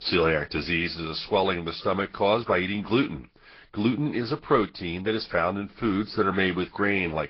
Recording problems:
high frequencies cut off; noticeable; nothing above 5 kHz
garbled, watery; slightly

